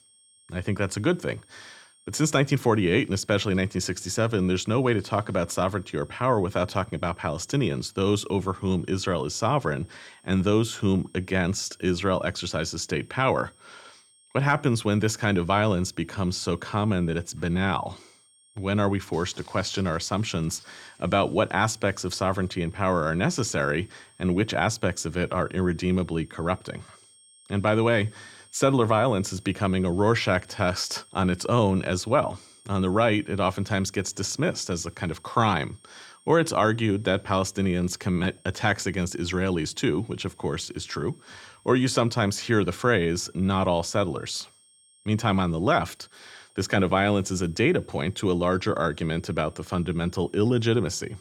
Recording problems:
high-pitched whine; faint; throughout; 8.5 kHz, 30 dB below the speech

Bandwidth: 18.5 kHz